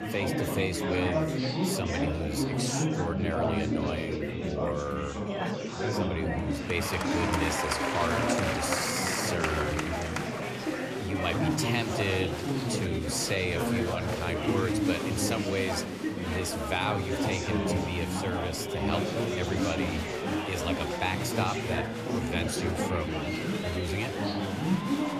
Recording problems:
murmuring crowd; very loud; throughout; 2 dB above the speech

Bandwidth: 14.5 kHz